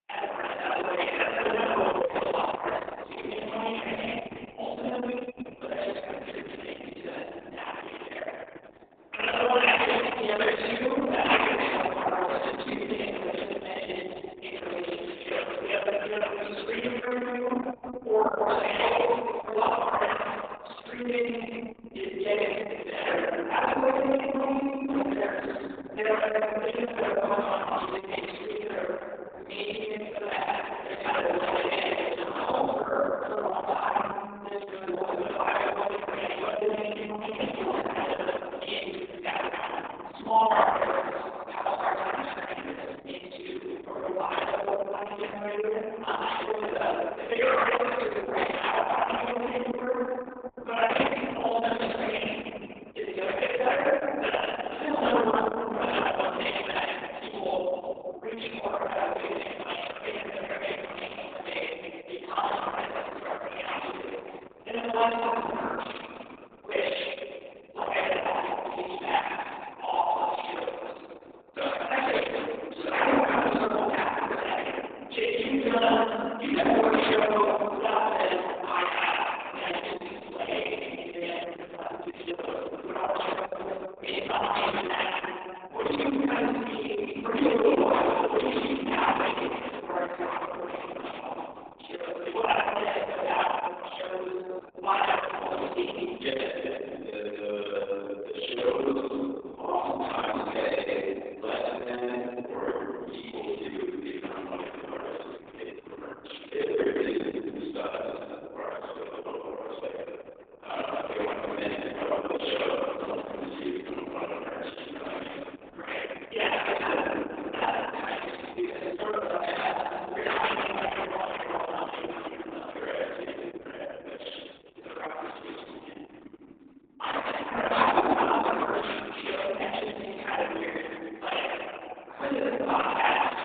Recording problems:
room echo; strong; dies away in 3 s
off-mic speech; far
garbled, watery; badly; nothing above 3.5 kHz
thin; somewhat; fading below 300 Hz
muffled; very slightly; fading above 4 kHz

